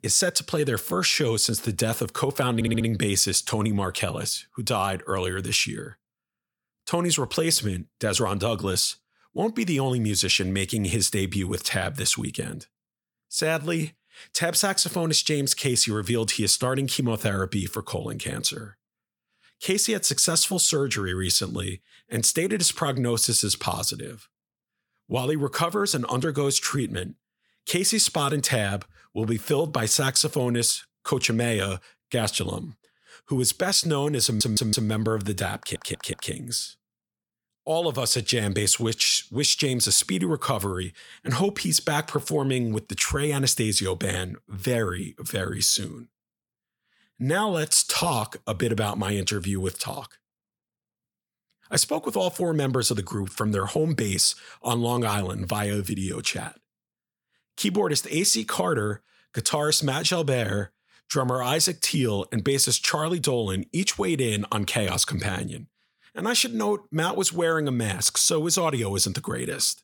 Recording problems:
audio stuttering; at 2.5 s, at 34 s and at 36 s

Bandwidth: 18 kHz